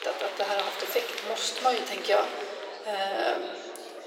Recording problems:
thin; very; fading below 400 Hz
room echo; slight; dies away in 2 s
off-mic speech; somewhat distant
murmuring crowd; loud; throughout; 8 dB below the speech

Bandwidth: 16 kHz